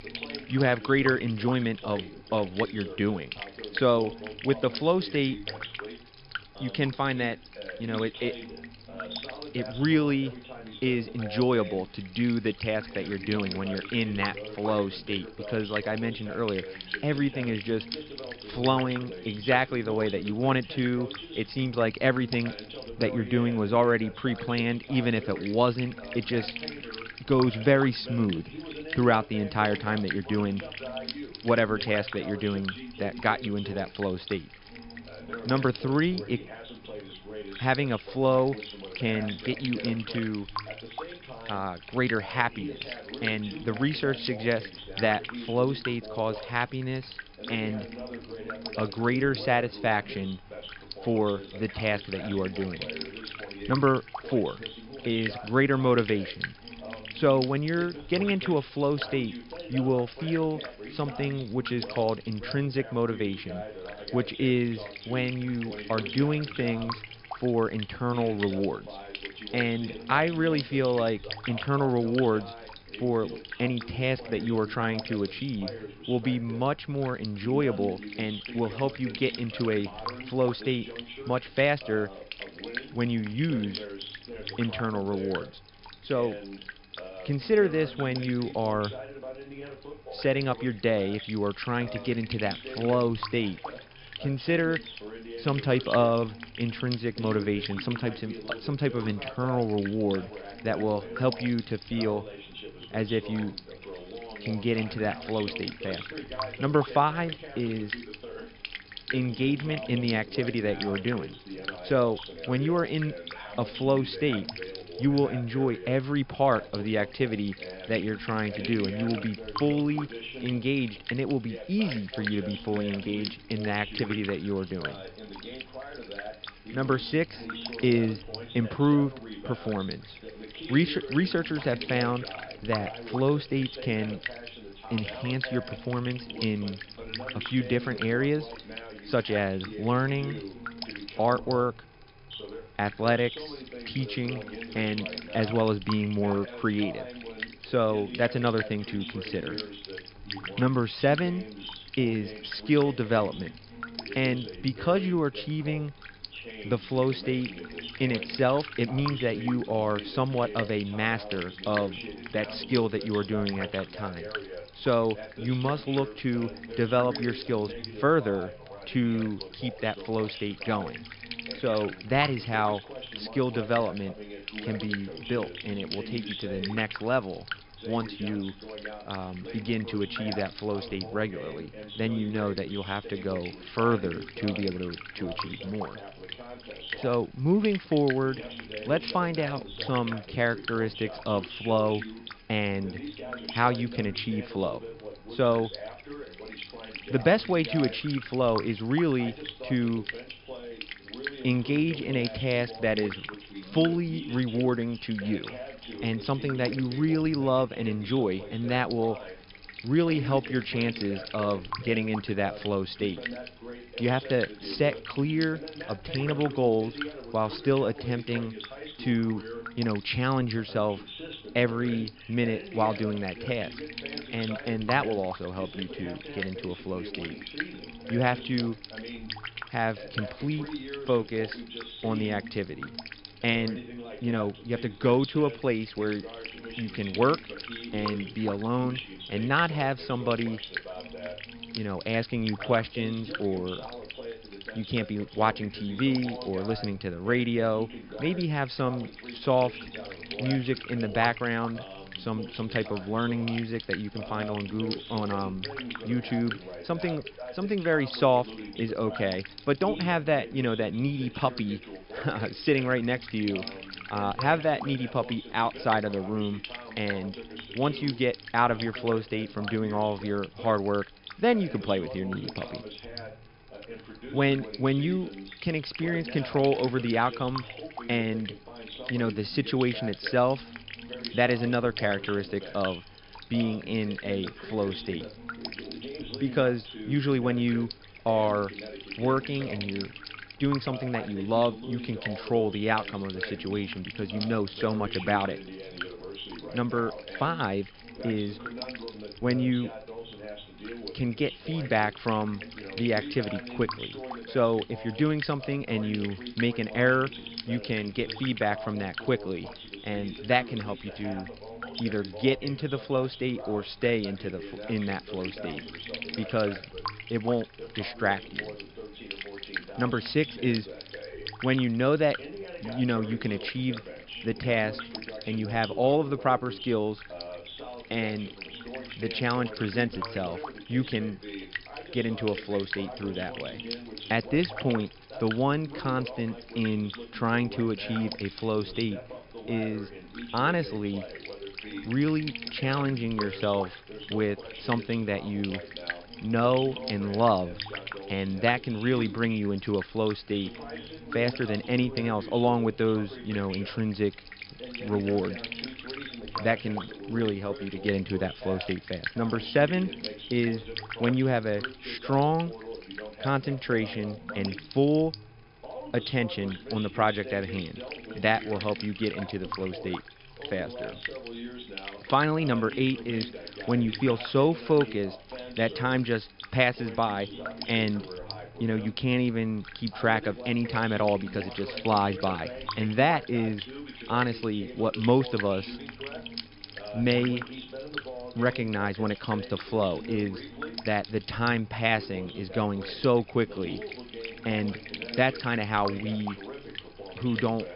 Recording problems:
high frequencies cut off; noticeable; nothing above 5.5 kHz
electrical hum; noticeable; throughout; 50 Hz, 10 dB below the speech
voice in the background; noticeable; throughout; 15 dB below the speech

